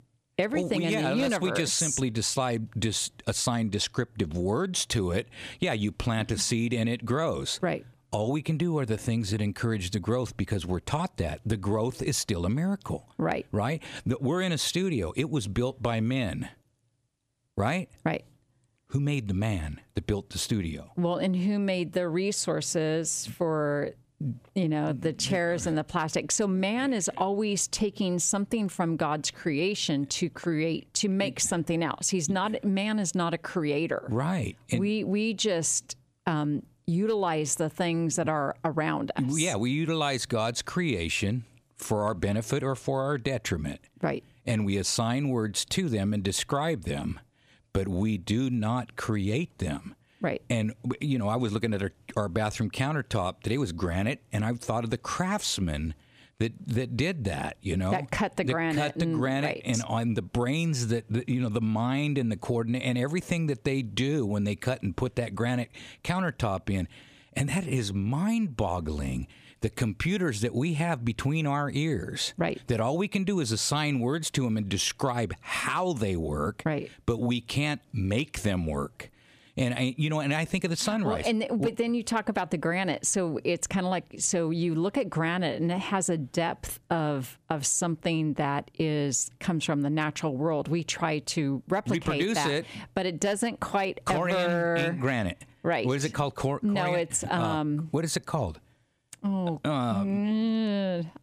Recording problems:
squashed, flat; somewhat

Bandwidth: 14.5 kHz